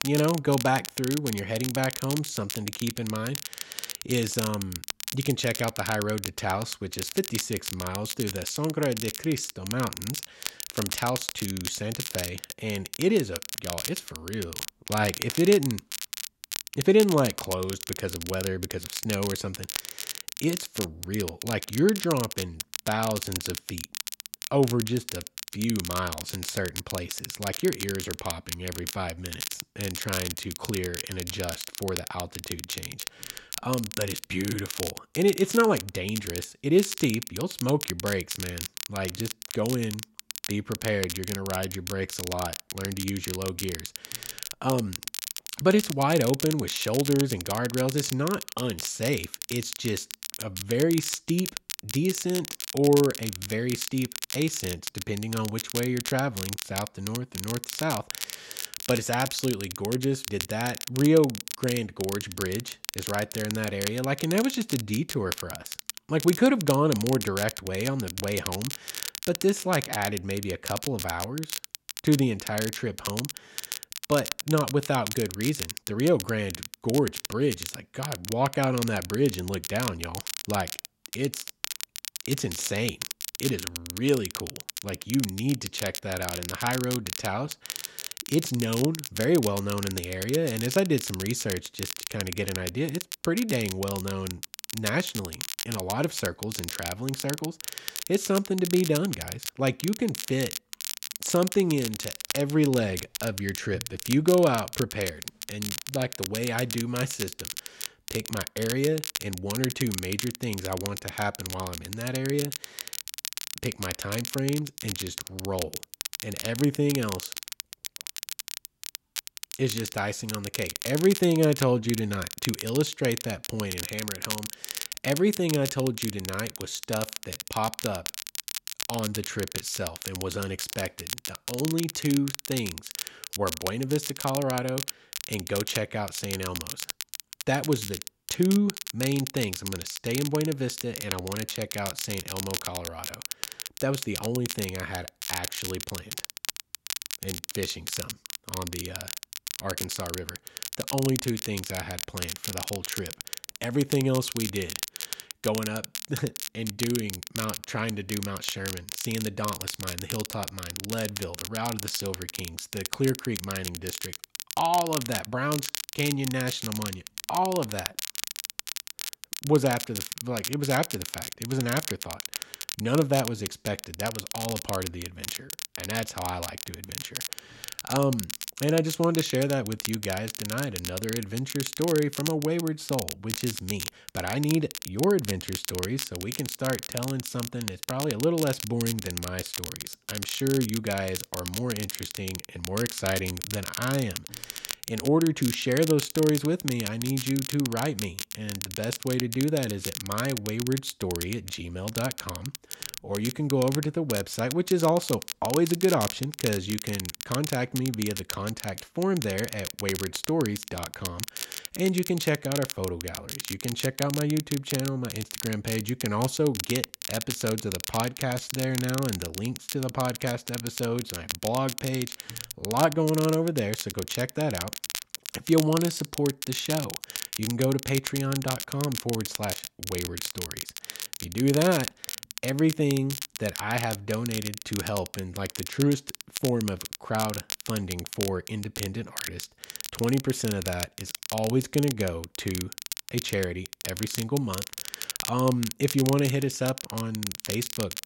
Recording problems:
crackle, like an old record; loud; 6 dB below the speech

